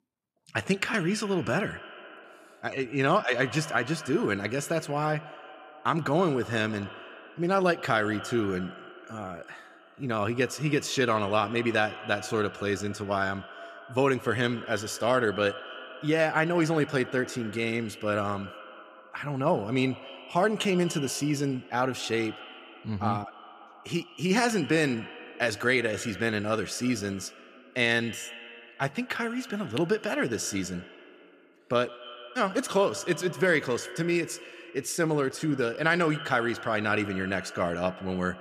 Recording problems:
echo of what is said; noticeable; throughout; 130 ms later, 15 dB below the speech

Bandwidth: 14.5 kHz